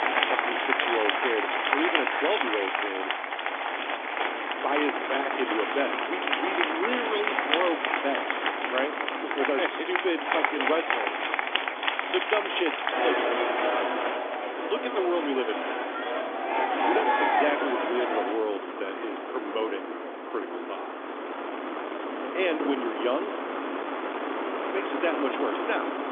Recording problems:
phone-call audio; nothing above 3.5 kHz
crowd noise; very loud; until 18 s; 3 dB above the speech
wind noise on the microphone; heavy; 4 dB below the speech
rain or running water; noticeable; throughout; 15 dB below the speech

